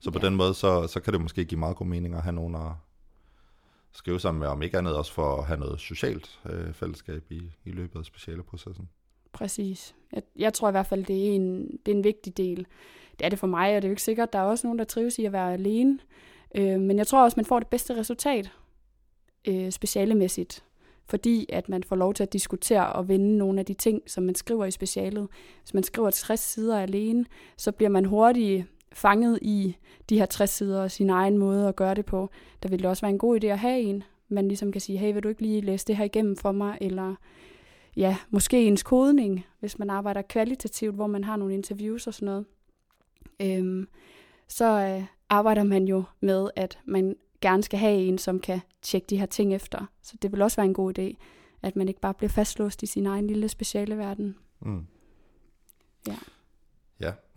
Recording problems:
none

